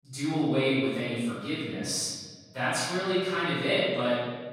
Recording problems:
room echo; strong; dies away in 1.4 s
off-mic speech; far

